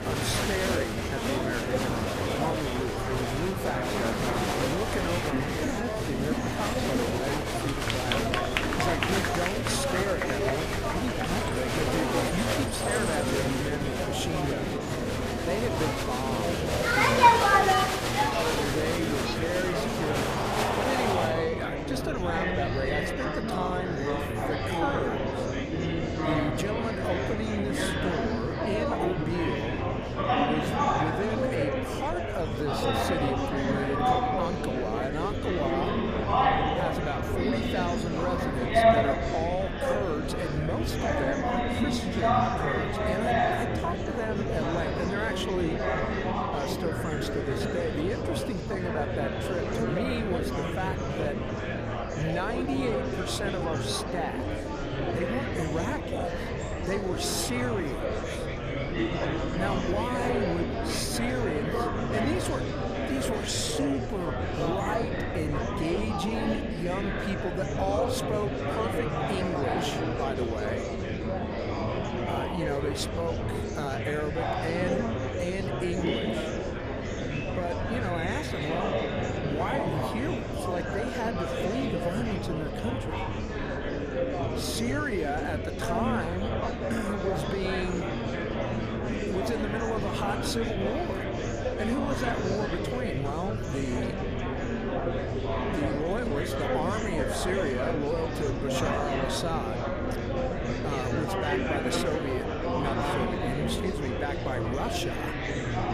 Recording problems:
murmuring crowd; very loud; throughout; 4 dB above the speech
low rumble; faint; throughout; 25 dB below the speech

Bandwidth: 14.5 kHz